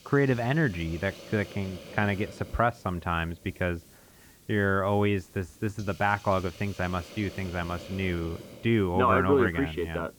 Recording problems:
muffled; very; fading above 3.5 kHz
hiss; noticeable; throughout; 20 dB below the speech

